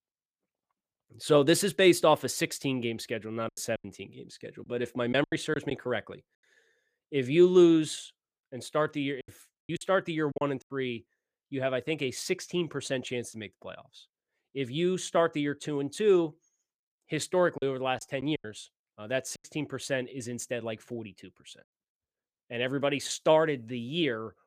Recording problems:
choppy; very; from 3.5 to 5.5 s, from 9 to 10 s and from 18 to 19 s; 9% of the speech affected

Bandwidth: 15 kHz